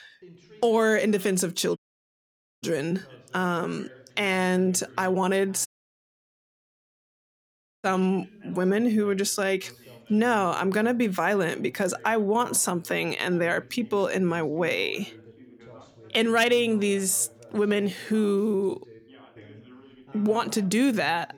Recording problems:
background chatter; faint; throughout; 2 voices, 25 dB below the speech
audio cutting out; at 2 s for 1 s and at 5.5 s for 2 s

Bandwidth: 18.5 kHz